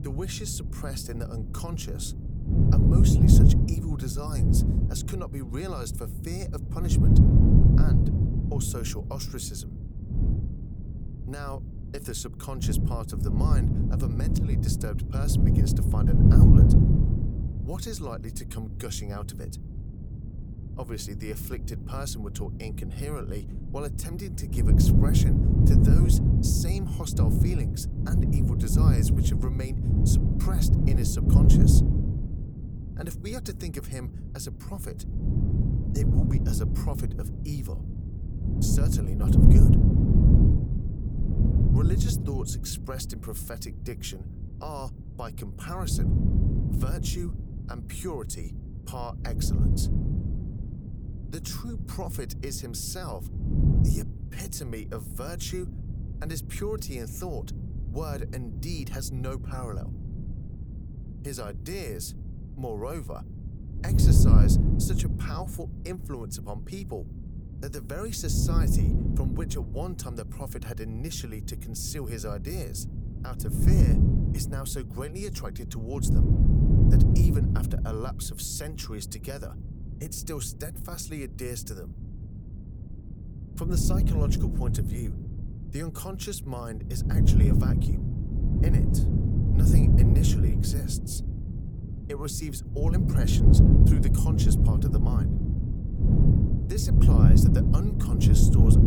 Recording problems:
wind noise on the microphone; heavy; 3 dB above the speech

